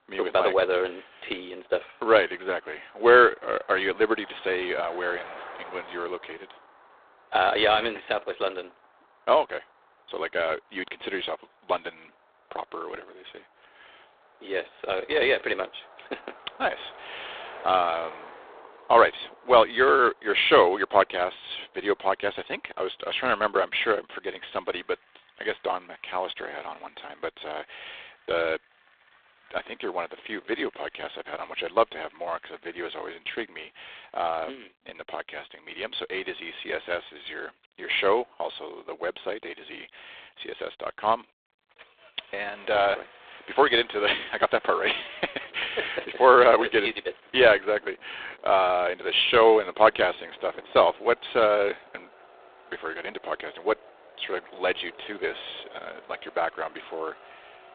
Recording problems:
phone-call audio; poor line; nothing above 3.5 kHz
traffic noise; faint; throughout; 25 dB below the speech

